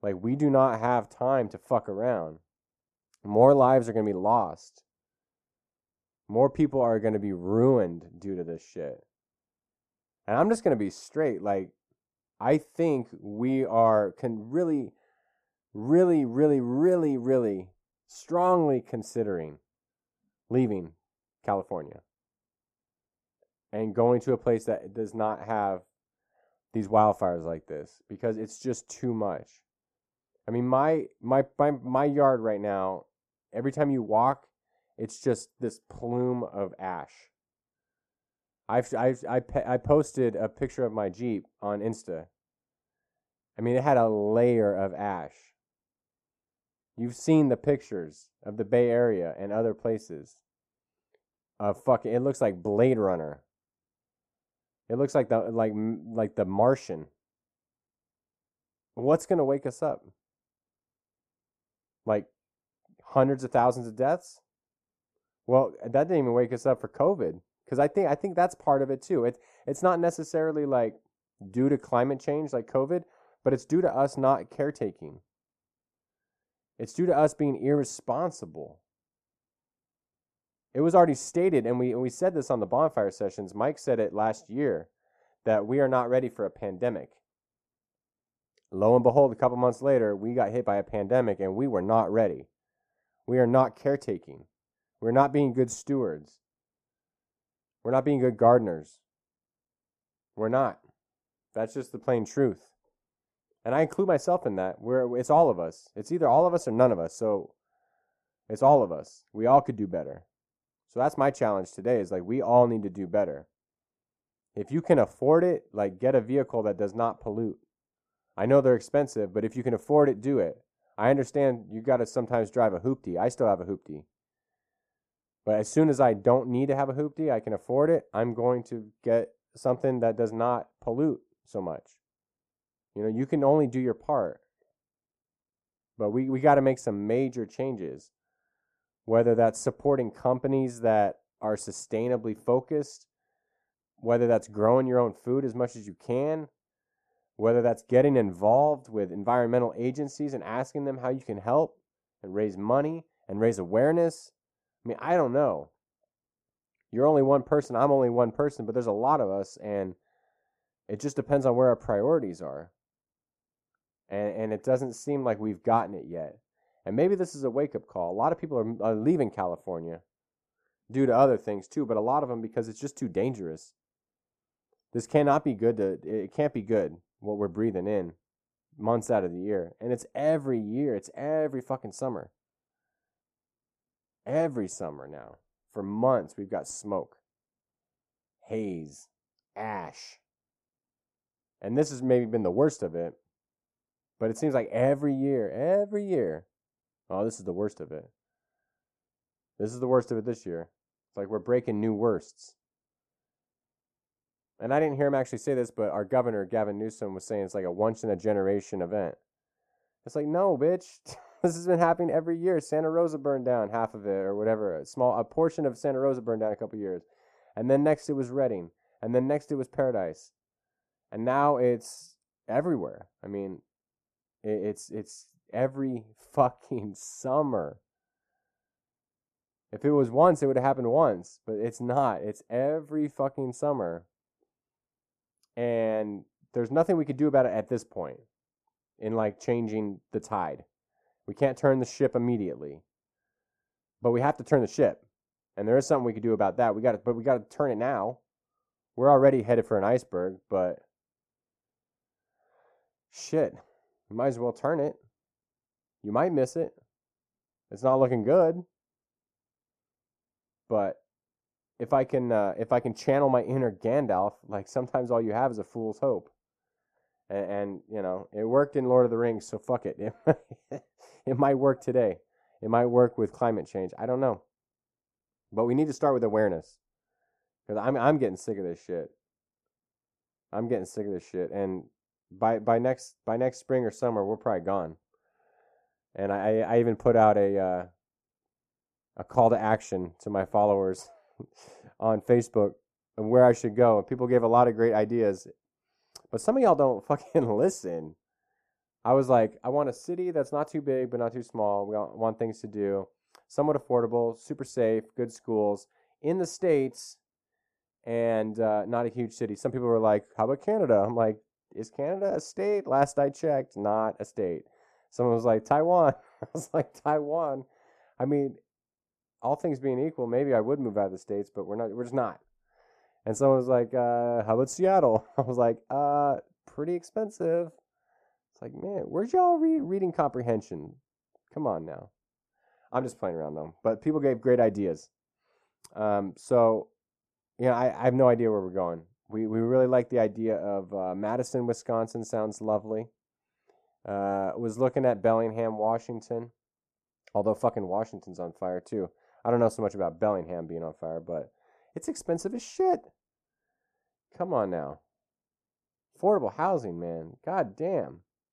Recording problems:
muffled; very; fading above 1.5 kHz

